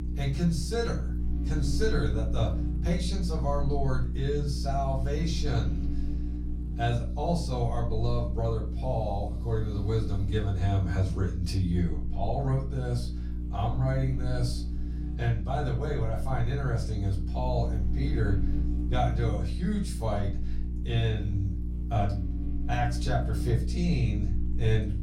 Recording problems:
off-mic speech; far
room echo; slight; dies away in 0.3 s
electrical hum; noticeable; throughout; 60 Hz, 10 dB below the speech

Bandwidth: 16 kHz